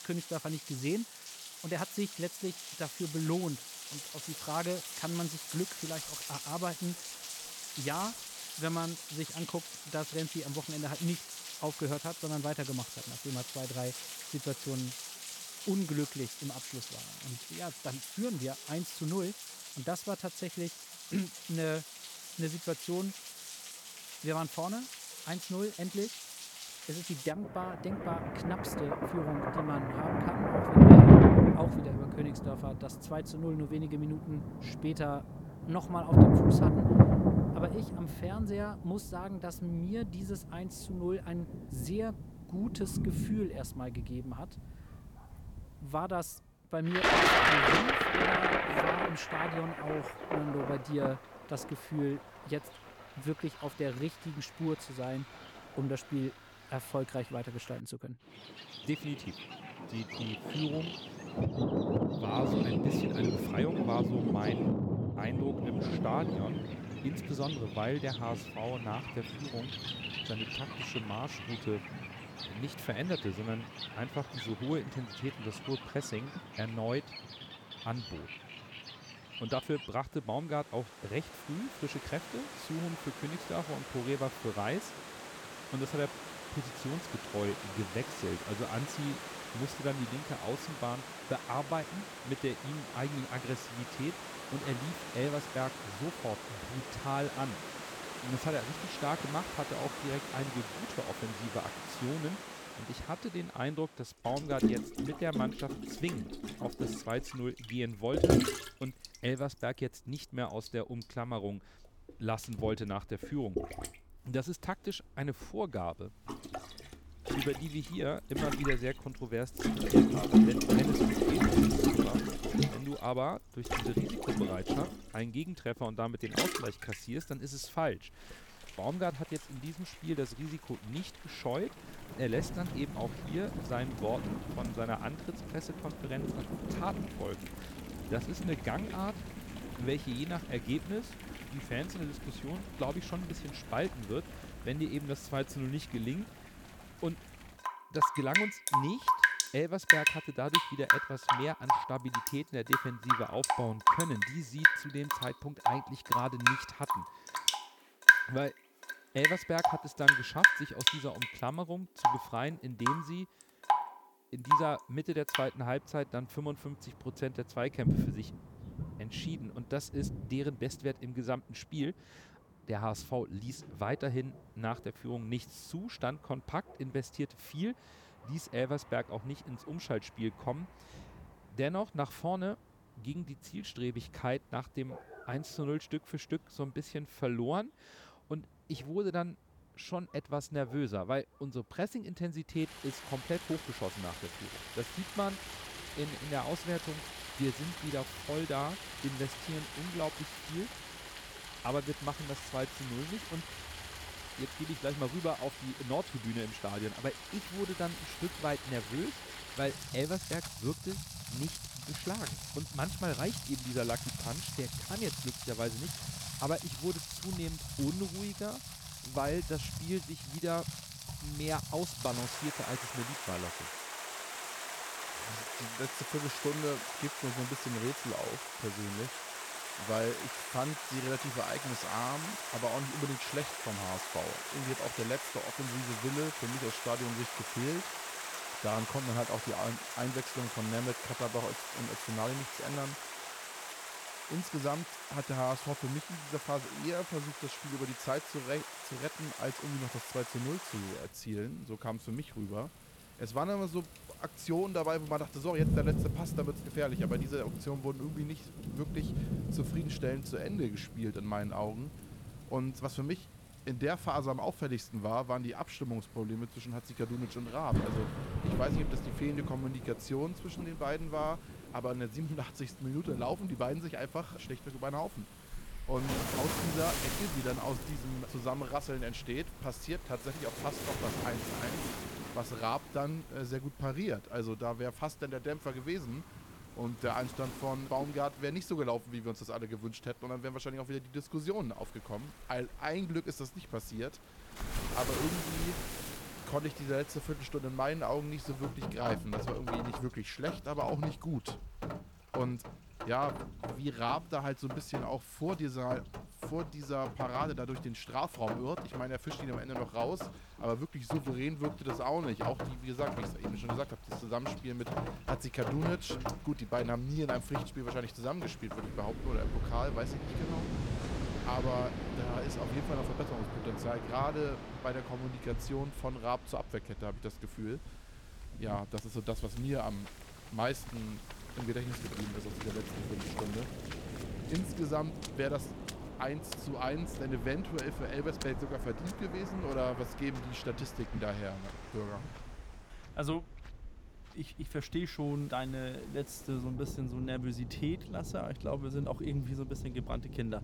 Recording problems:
rain or running water; very loud; throughout; 5 dB above the speech

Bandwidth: 18 kHz